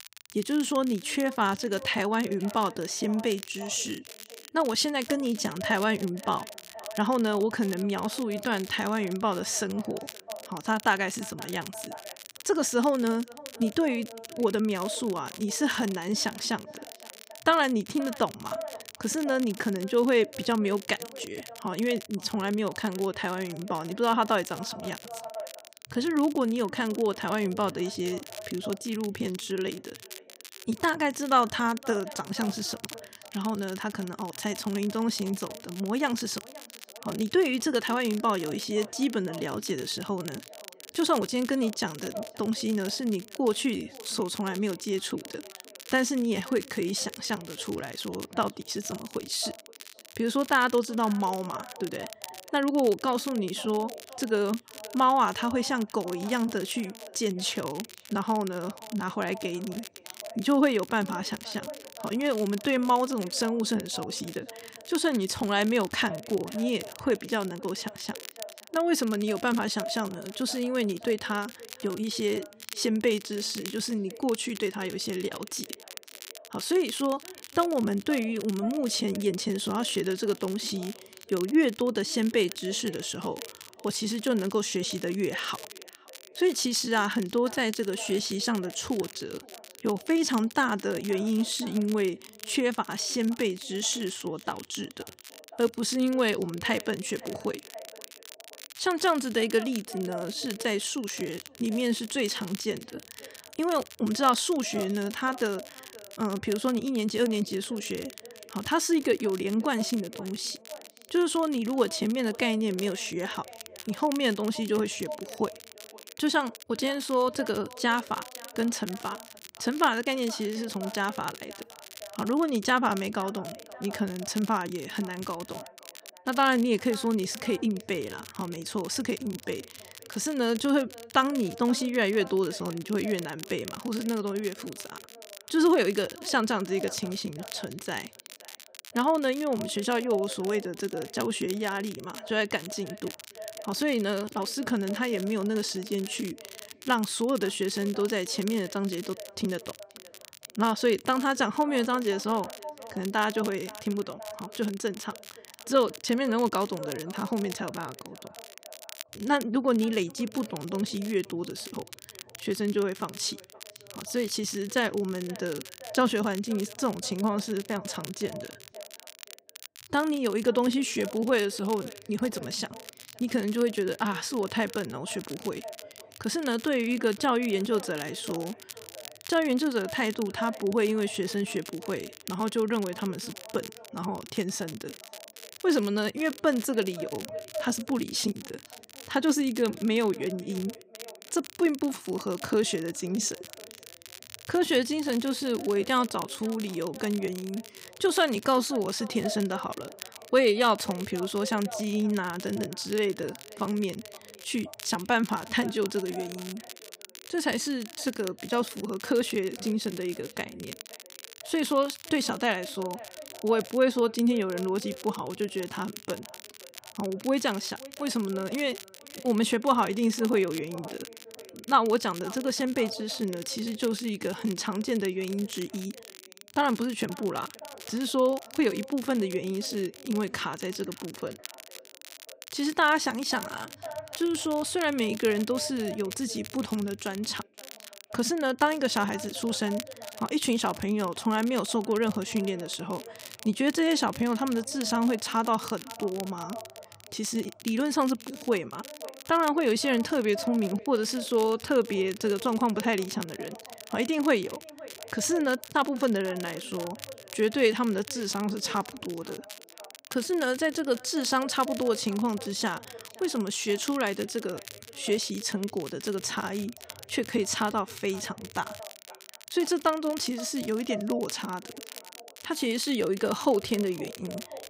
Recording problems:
echo of what is said; faint; throughout; 520 ms later, 20 dB below the speech
crackle, like an old record; noticeable; 15 dB below the speech
uneven, jittery; slightly; from 21 s to 4:16

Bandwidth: 15.5 kHz